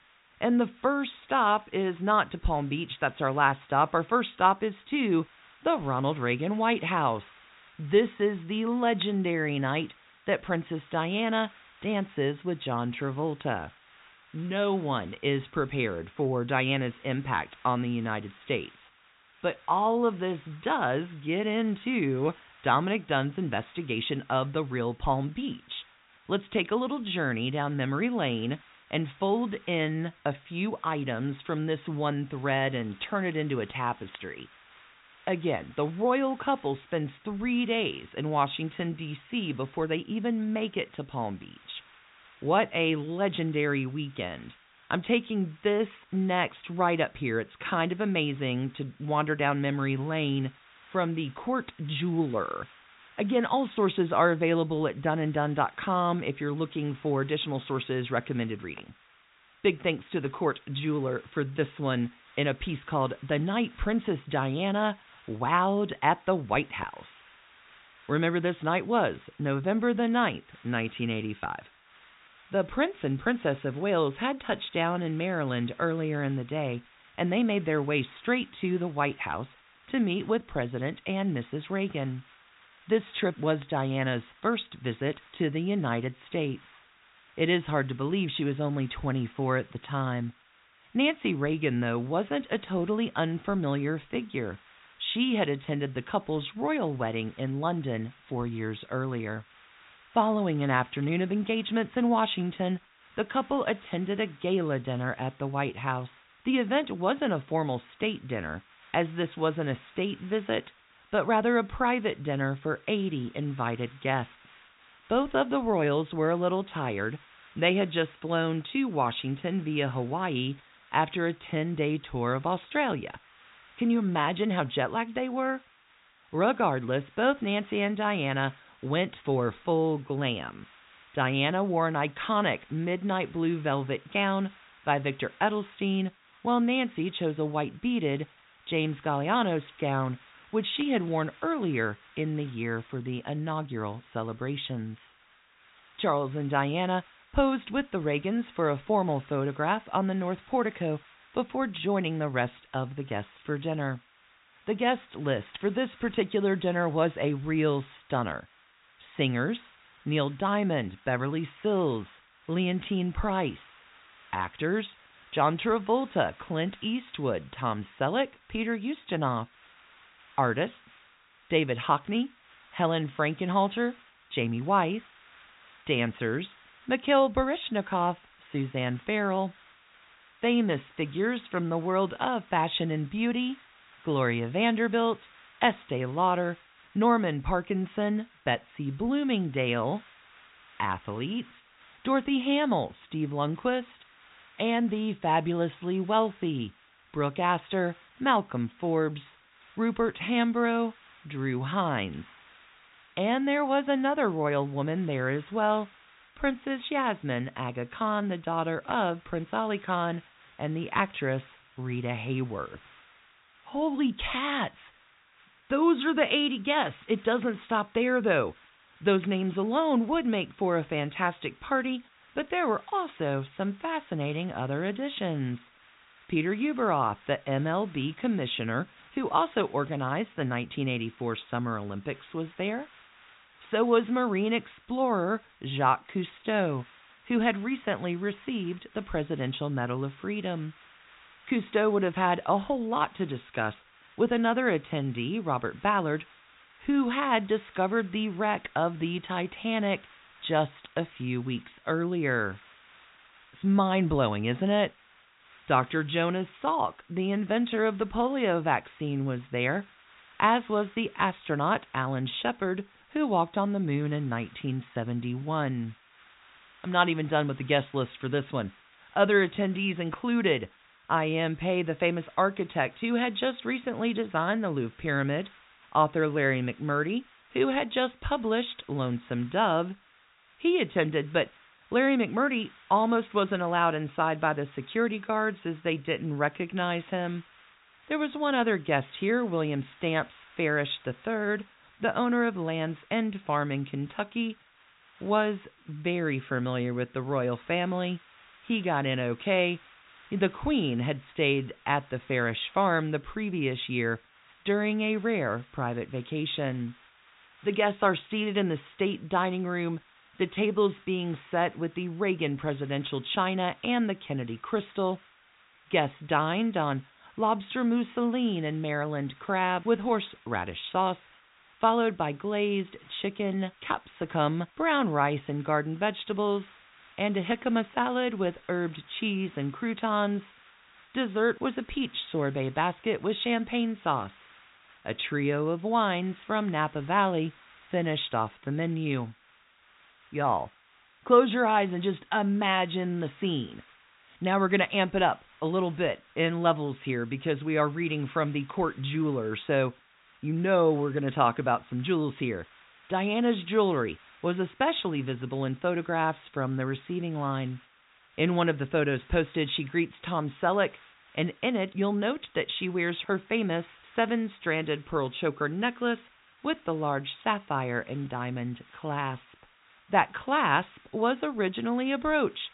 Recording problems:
high frequencies cut off; severe; nothing above 4 kHz
hiss; faint; throughout; 25 dB below the speech

